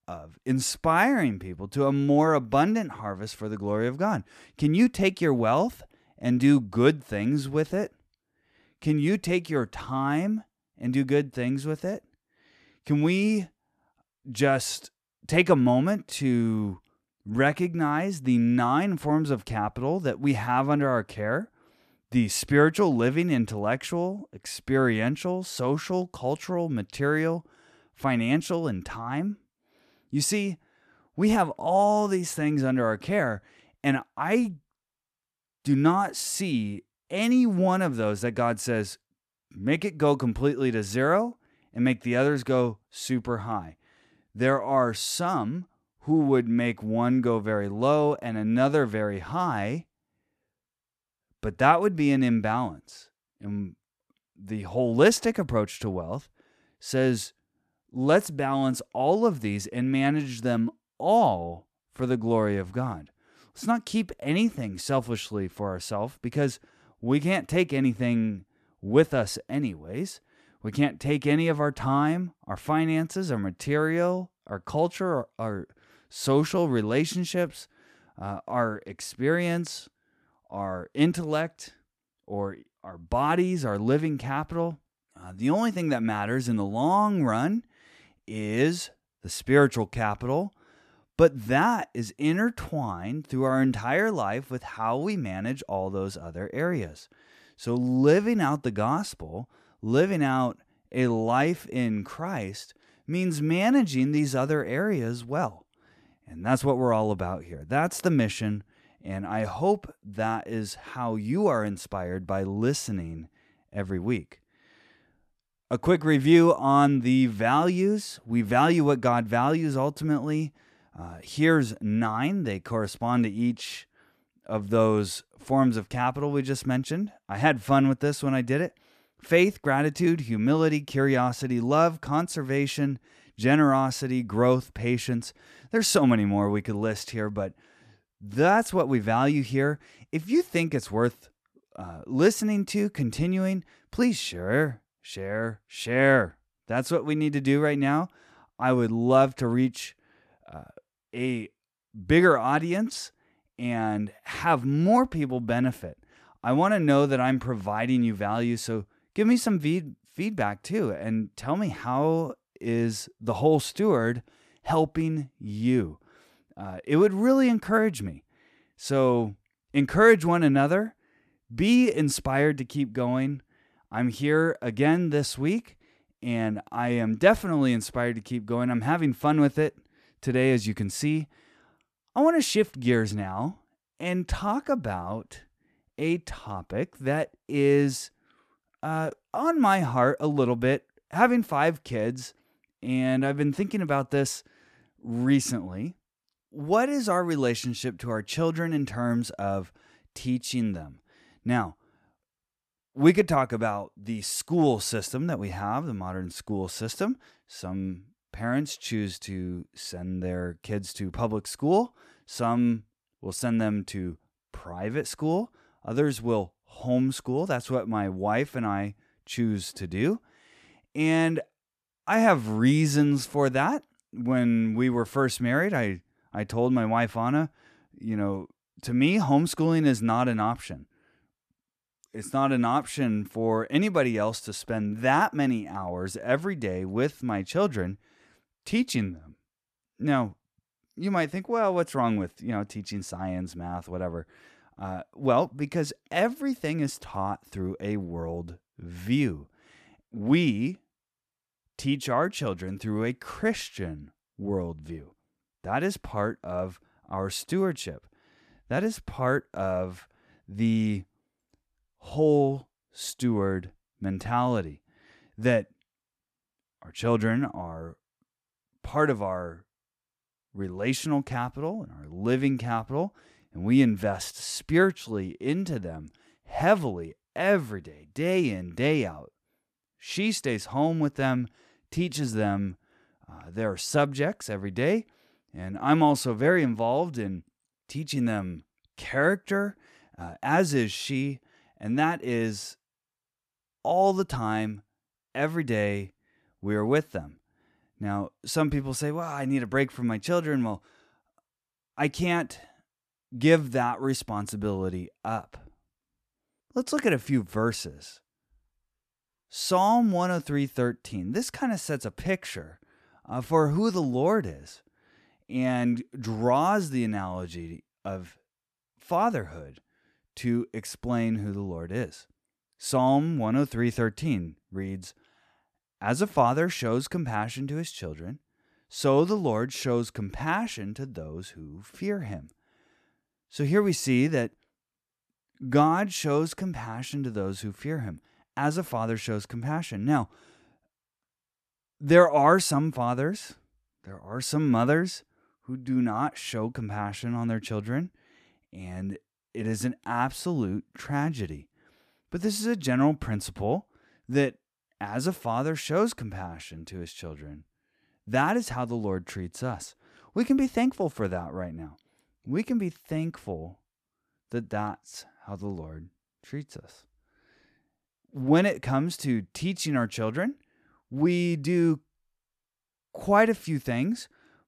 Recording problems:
none

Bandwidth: 14 kHz